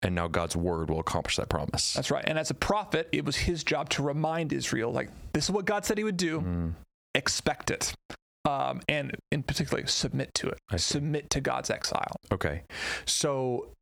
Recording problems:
squashed, flat; heavily

